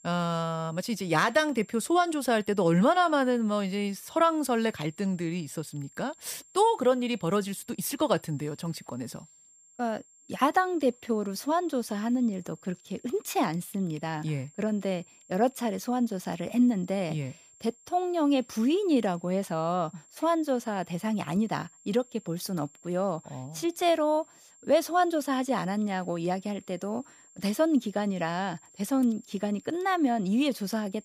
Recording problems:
high-pitched whine; faint; throughout; 7.5 kHz, 25 dB below the speech

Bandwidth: 15 kHz